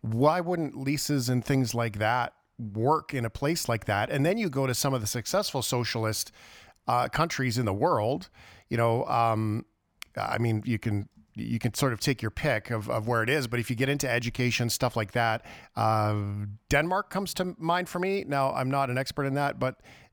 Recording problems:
none

